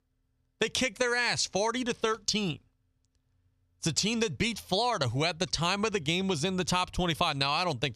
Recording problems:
squashed, flat; somewhat

